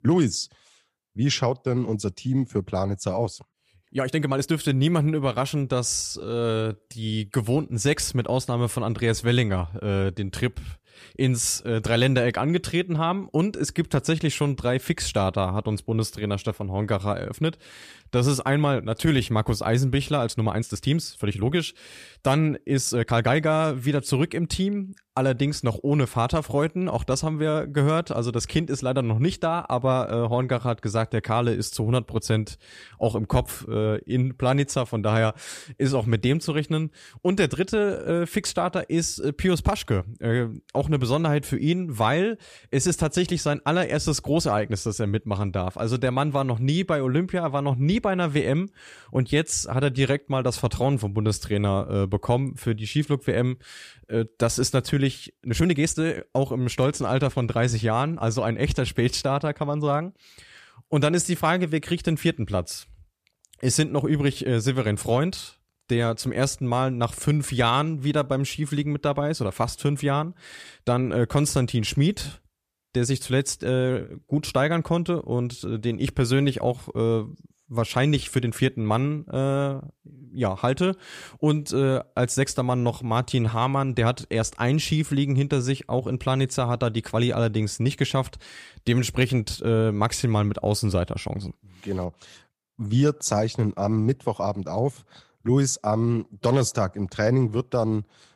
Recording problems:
uneven, jittery; strongly; from 3.5 s to 1:24

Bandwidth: 14.5 kHz